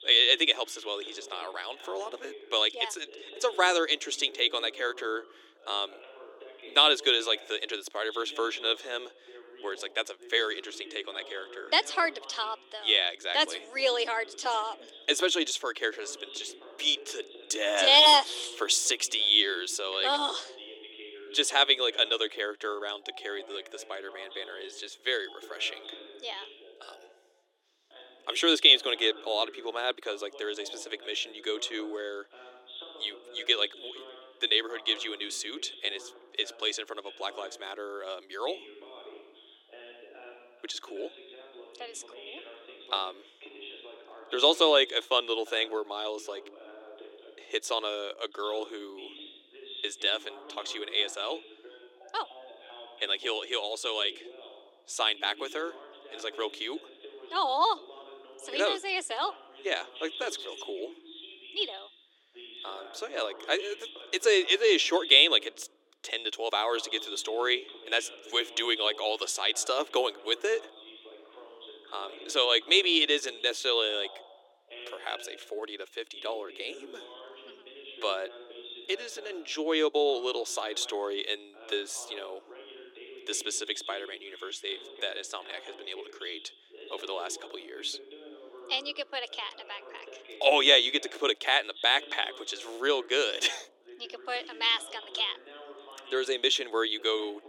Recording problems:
thin; very; fading below 300 Hz
voice in the background; noticeable; throughout; 20 dB below the speech

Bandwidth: 17 kHz